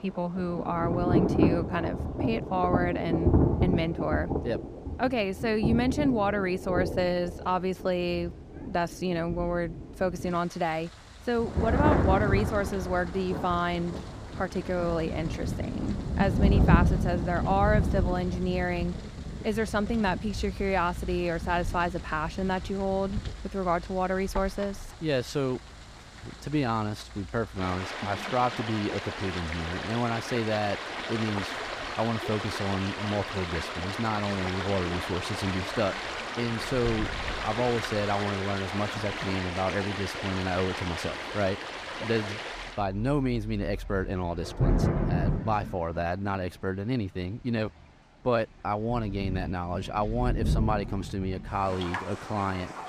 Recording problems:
rain or running water; loud; throughout; 2 dB below the speech

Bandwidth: 15 kHz